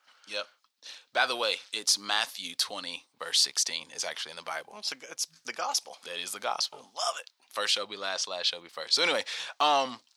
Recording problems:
thin; very; fading below 750 Hz

